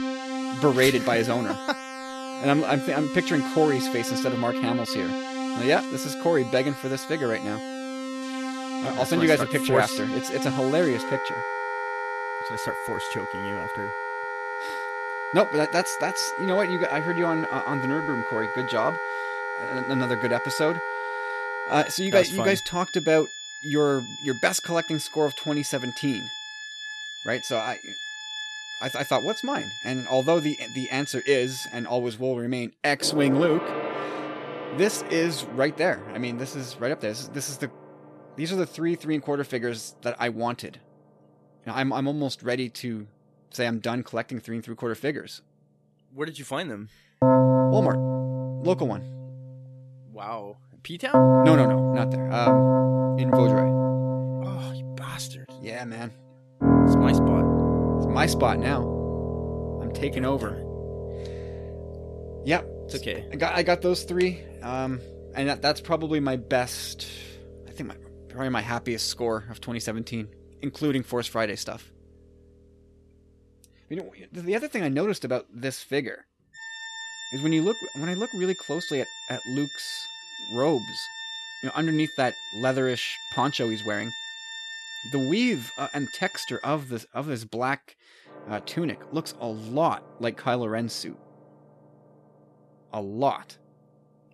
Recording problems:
background music; loud; throughout; 1 dB below the speech

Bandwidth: 13.5 kHz